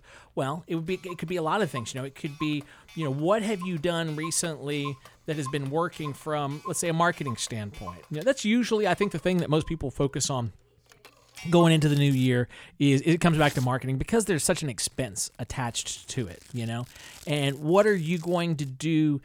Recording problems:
household noises; noticeable; throughout; 20 dB below the speech

